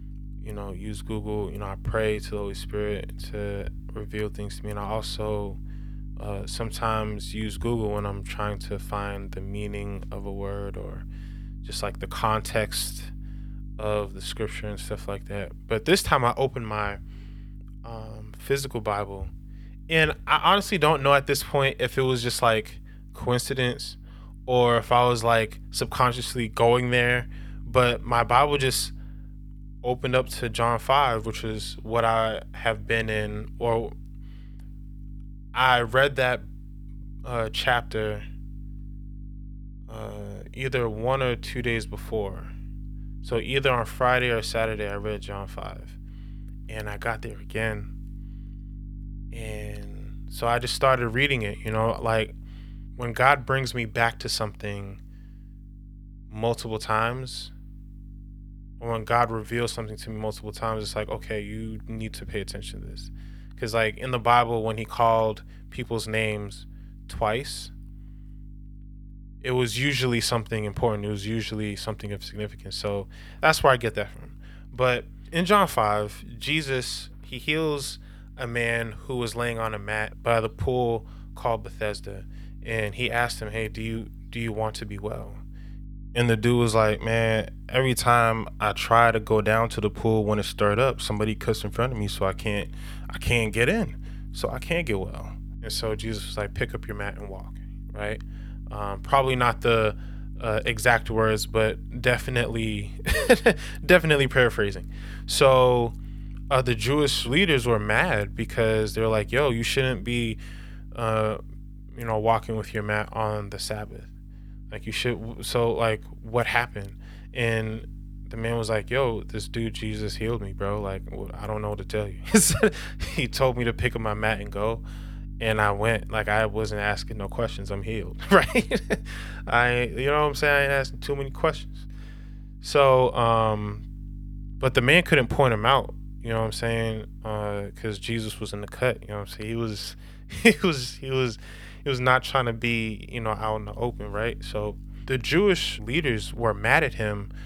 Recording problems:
electrical hum; faint; throughout; 50 Hz, 30 dB below the speech

